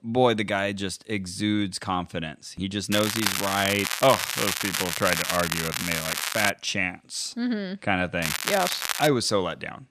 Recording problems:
crackling; loud; from 3 to 6.5 s and at 8 s; 1 dB below the speech

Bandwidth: 14.5 kHz